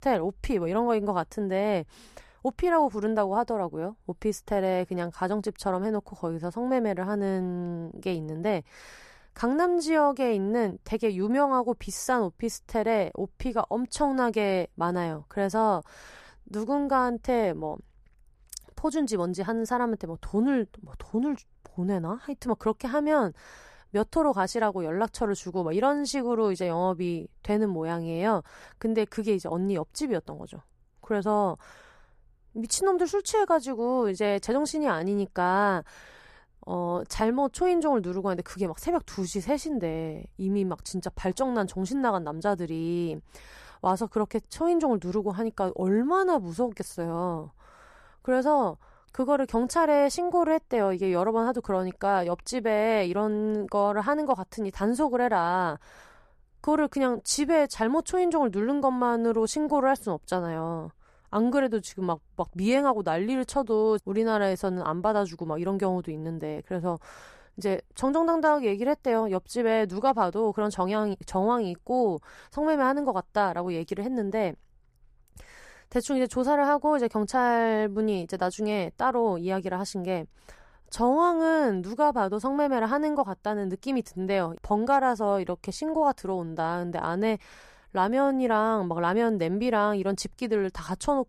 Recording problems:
none

